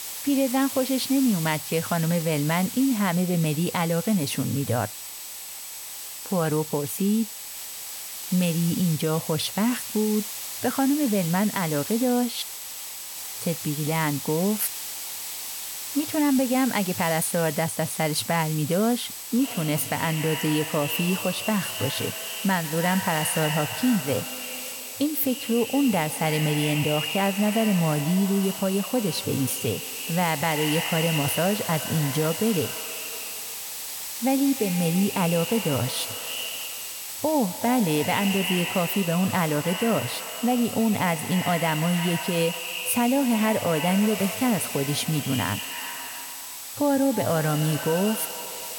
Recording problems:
echo of what is said; strong; from 19 s on; 130 ms later, 8 dB below the speech
hiss; loud; throughout; 8 dB below the speech
high-pitched whine; noticeable; throughout; 8 kHz, 20 dB below the speech

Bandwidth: 17 kHz